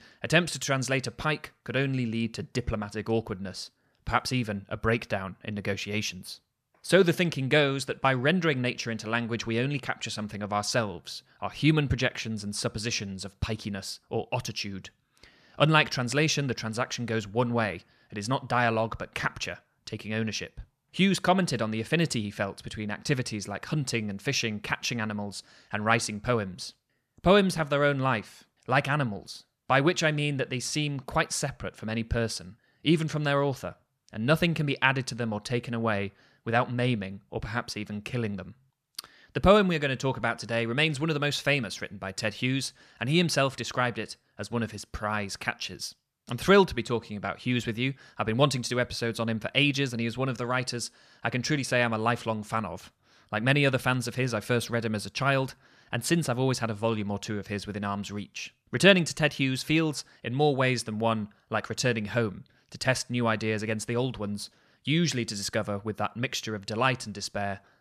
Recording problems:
none

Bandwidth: 14.5 kHz